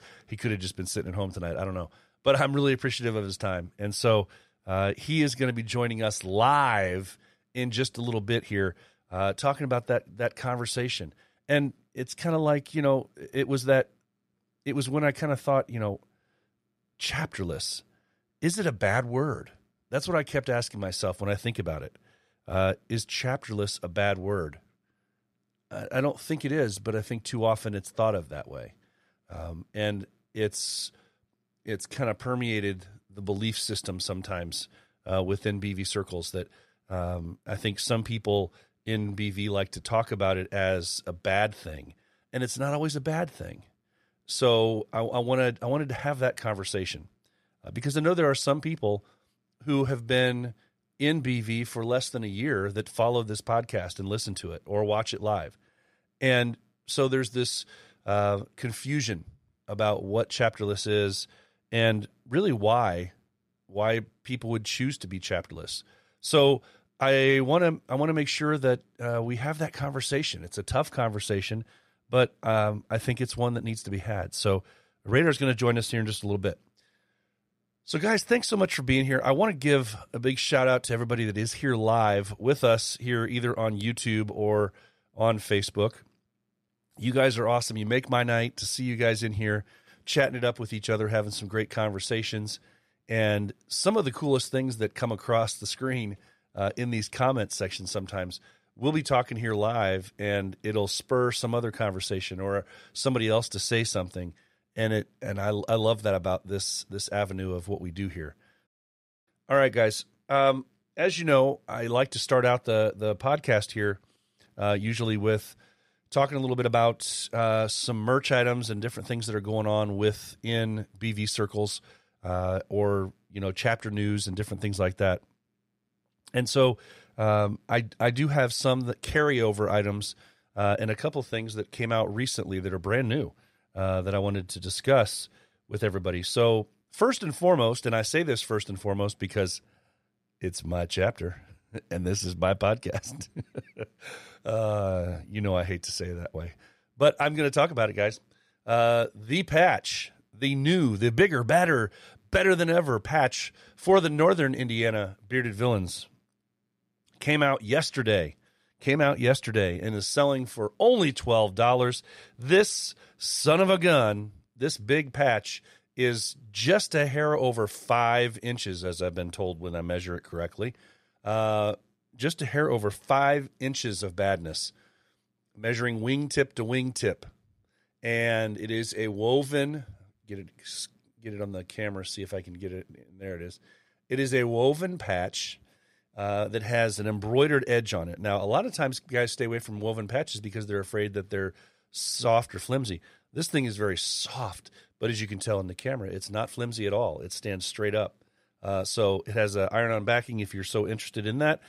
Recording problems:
none

